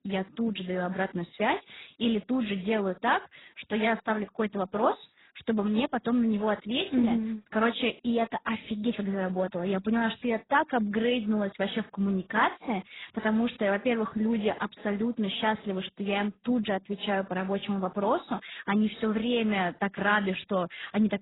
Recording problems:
garbled, watery; badly; nothing above 4 kHz

